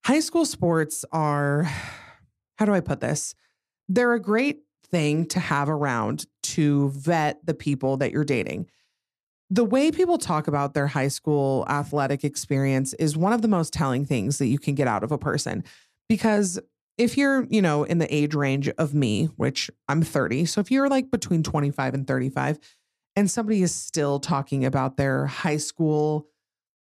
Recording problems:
none

